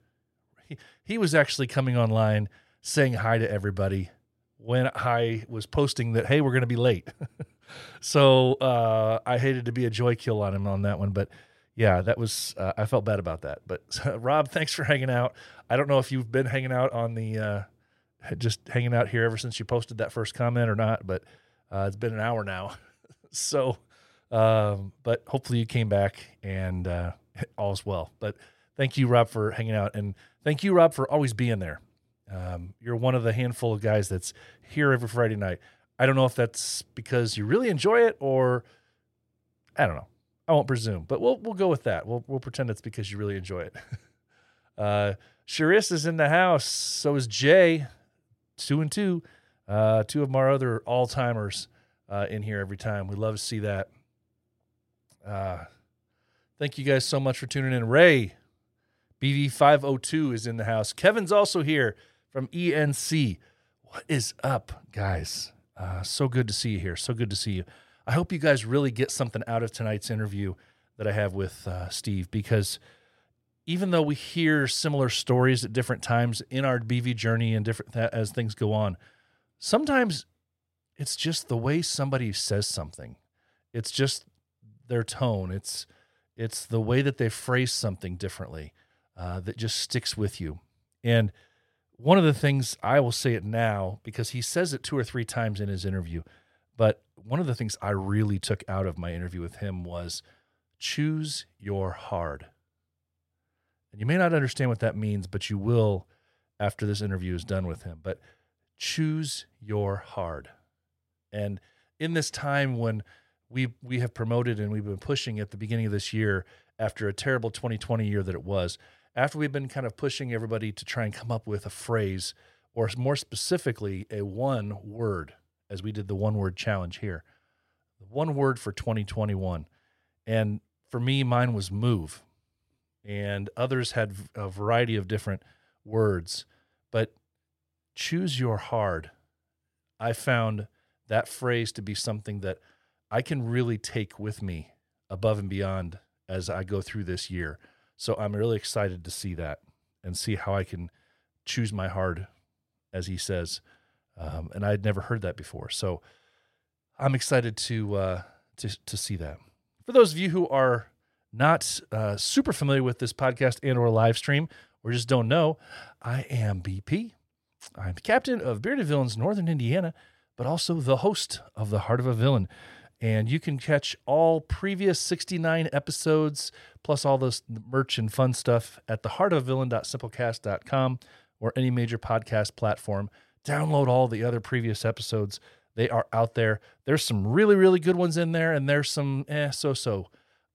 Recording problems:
none

